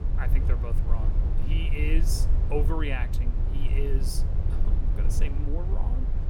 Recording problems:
low rumble; loud; throughout; 6 dB below the speech

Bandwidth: 17.5 kHz